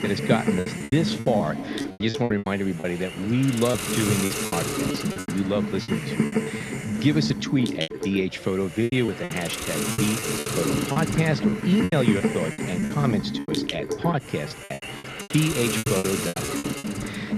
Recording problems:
muffled; slightly; fading above 4 kHz
hiss; loud; throughout; 2 dB below the speech
murmuring crowd; noticeable; throughout; 20 dB below the speech
choppy; very; 14% of the speech affected

